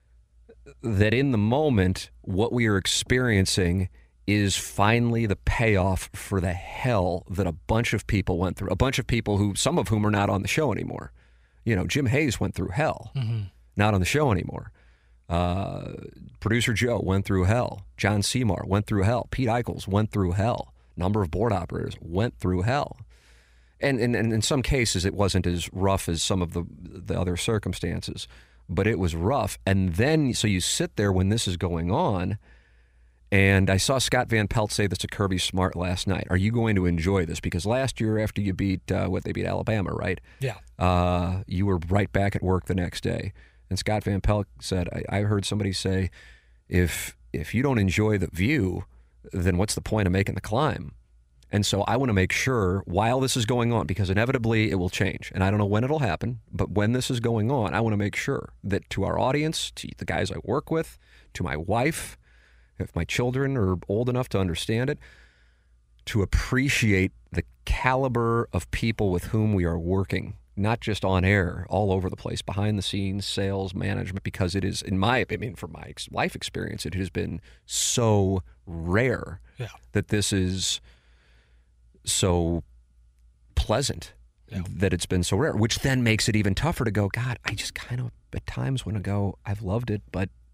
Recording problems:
none

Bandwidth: 15.5 kHz